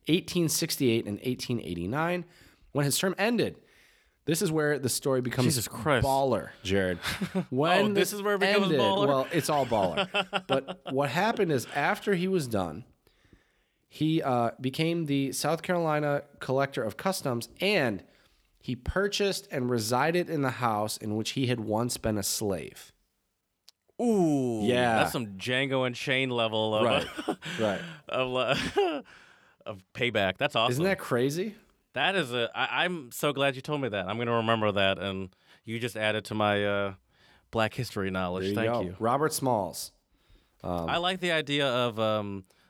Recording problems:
uneven, jittery; strongly; from 2.5 to 41 s

